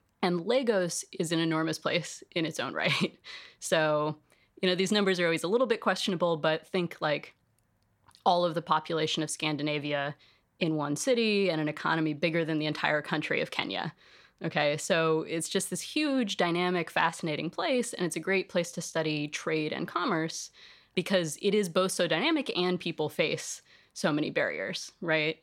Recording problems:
none

